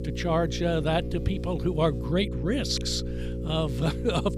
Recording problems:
electrical hum; noticeable; throughout; 60 Hz, 10 dB below the speech

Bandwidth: 15.5 kHz